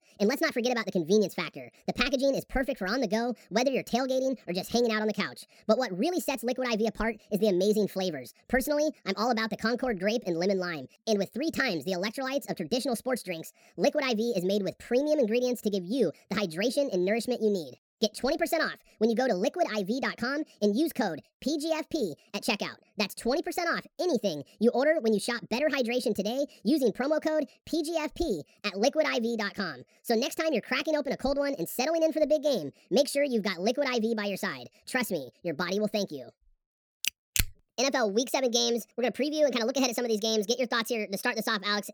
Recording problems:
wrong speed and pitch; too fast and too high; 1.6 times normal speed

